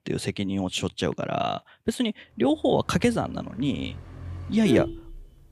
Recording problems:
traffic noise; loud; from 2.5 s on; 8 dB below the speech

